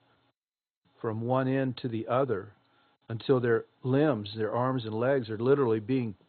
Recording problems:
garbled, watery; badly; nothing above 4 kHz

